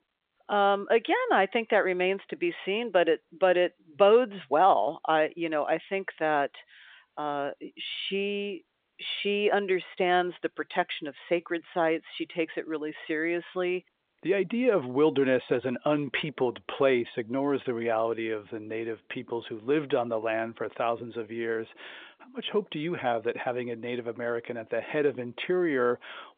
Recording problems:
phone-call audio

